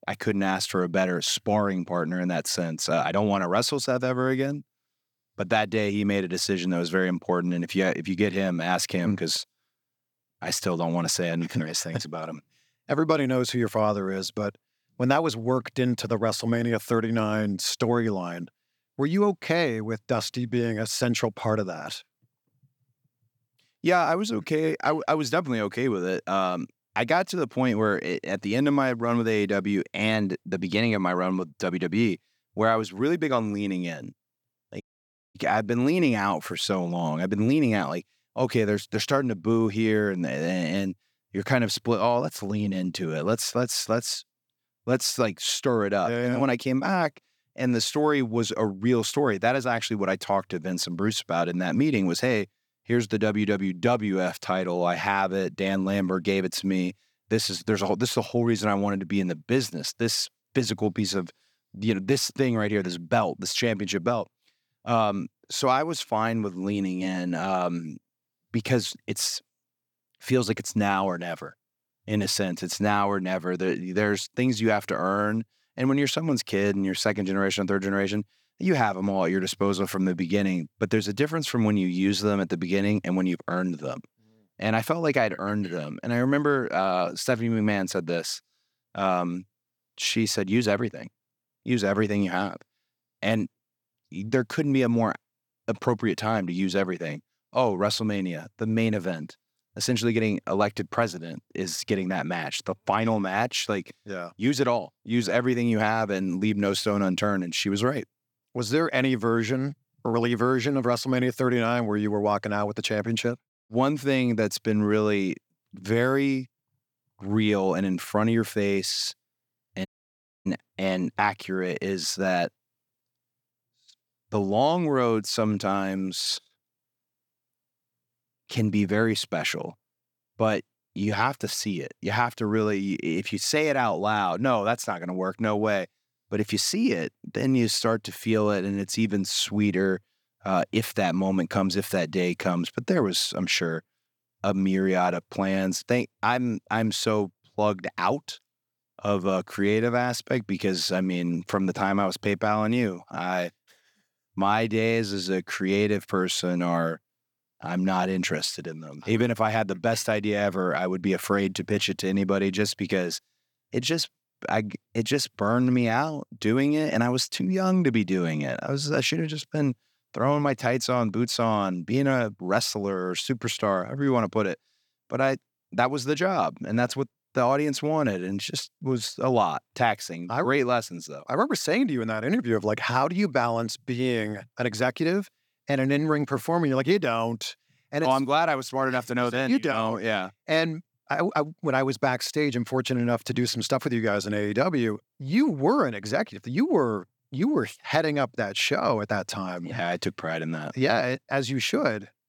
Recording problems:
audio cutting out; at 35 s for 0.5 s and at 2:00 for 0.5 s

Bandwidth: 18.5 kHz